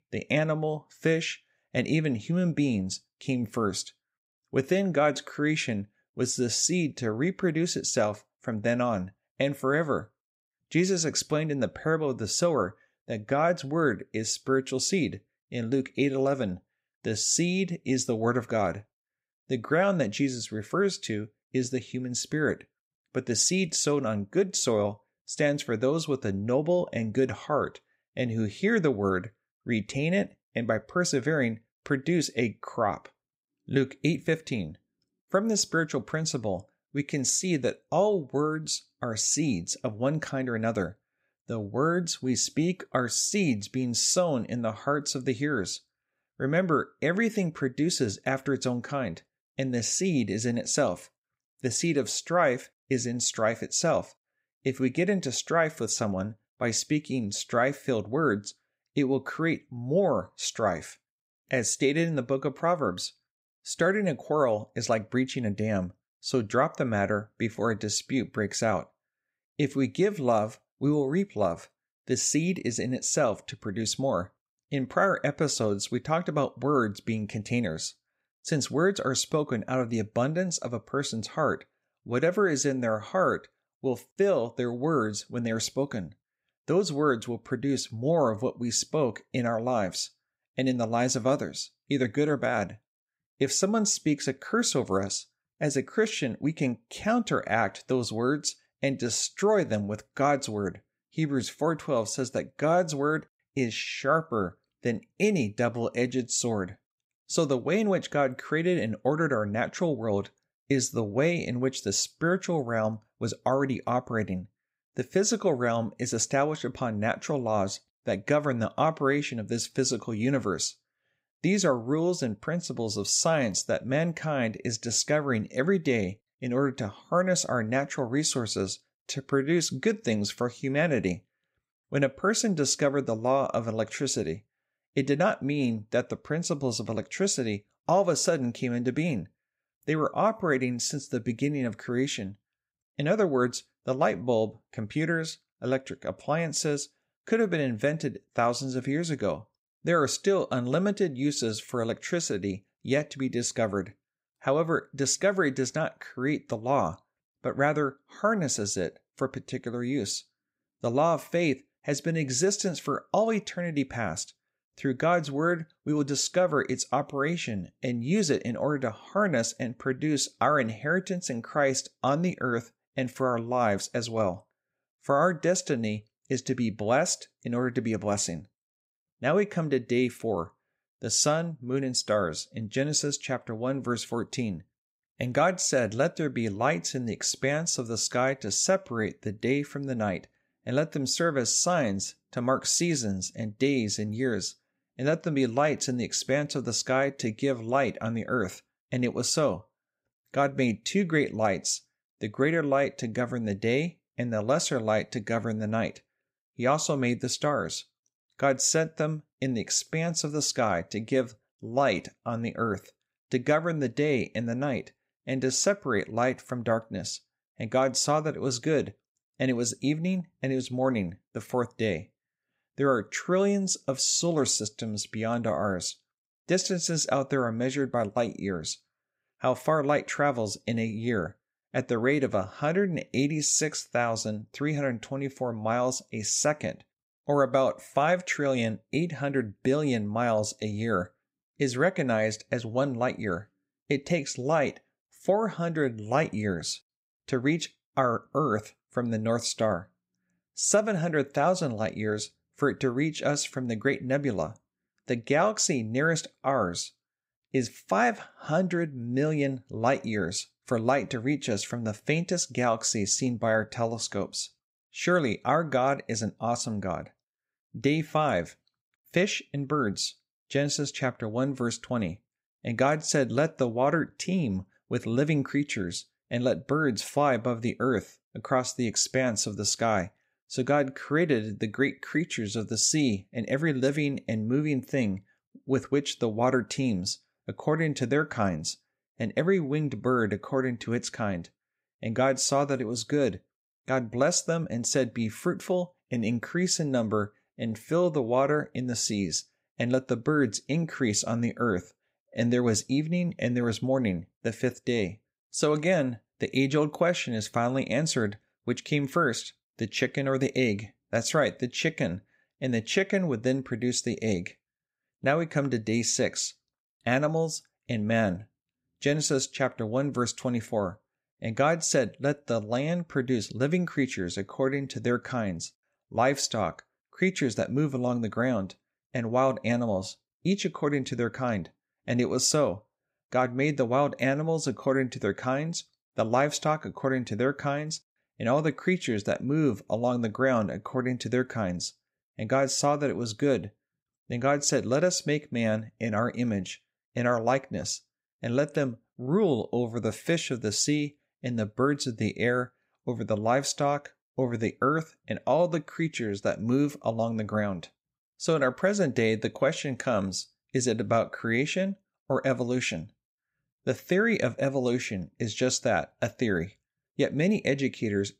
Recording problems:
none

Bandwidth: 15.5 kHz